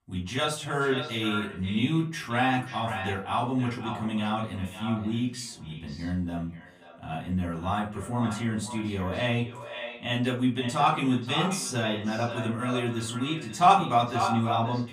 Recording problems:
echo of what is said; strong; throughout; 530 ms later, 9 dB below the speech
off-mic speech; far
room echo; very slight; dies away in 0.3 s

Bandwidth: 15 kHz